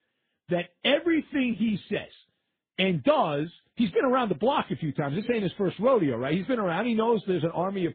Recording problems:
garbled, watery; badly
high frequencies cut off; severe; nothing above 4 kHz

